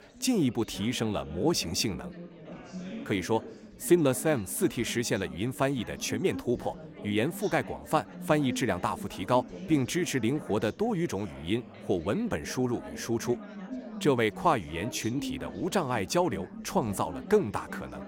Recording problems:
chatter from many people; noticeable; throughout; 15 dB below the speech

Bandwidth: 16.5 kHz